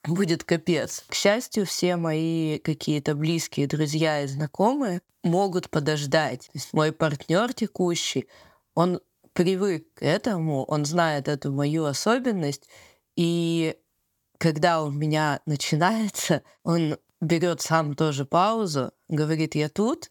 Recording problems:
none

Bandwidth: 18.5 kHz